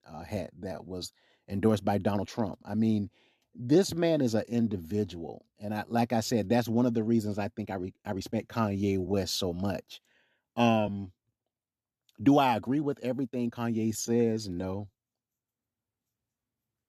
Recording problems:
uneven, jittery; strongly; from 0.5 to 15 s

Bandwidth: 13.5 kHz